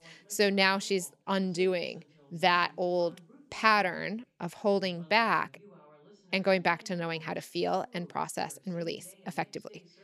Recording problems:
voice in the background; faint; throughout; 30 dB below the speech

